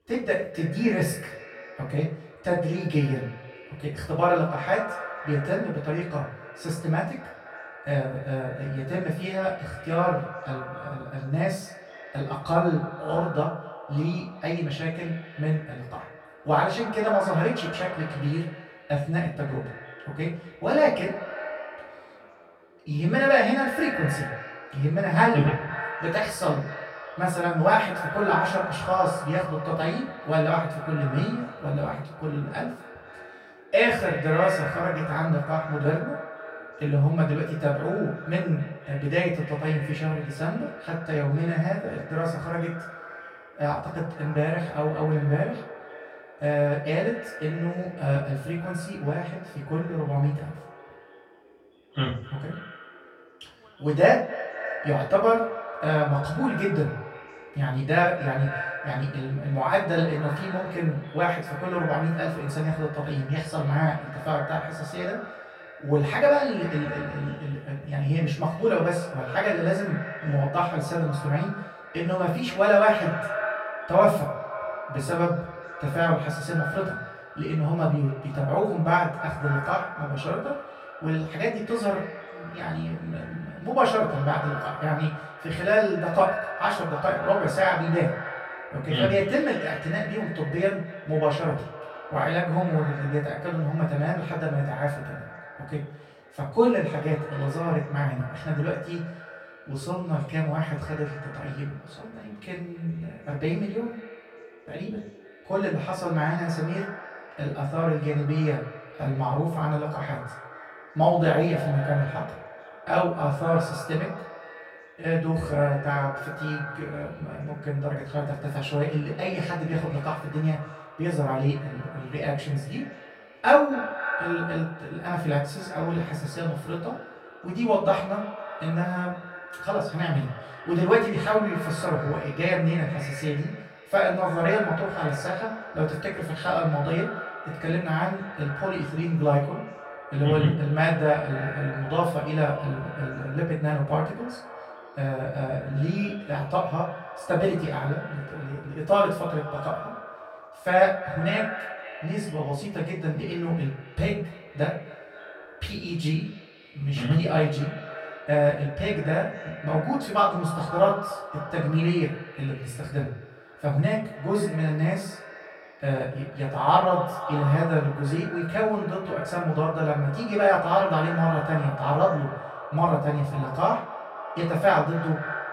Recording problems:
echo of what is said; strong; throughout; 250 ms later, 10 dB below the speech
off-mic speech; far
room echo; noticeable; dies away in 0.4 s
background chatter; faint; throughout; 4 voices, 30 dB below the speech

